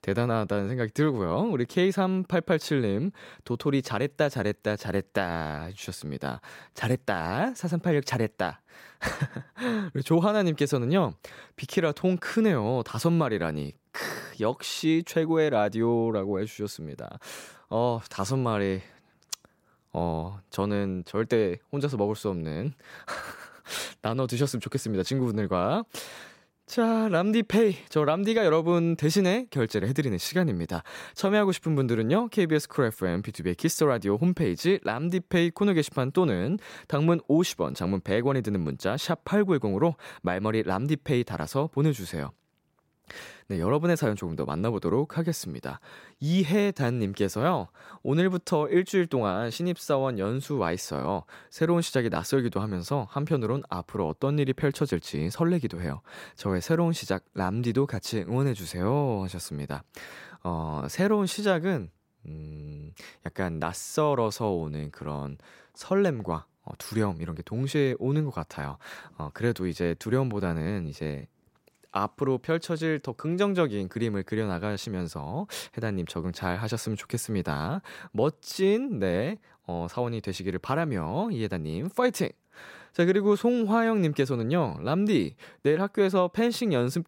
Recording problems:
none

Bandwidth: 16 kHz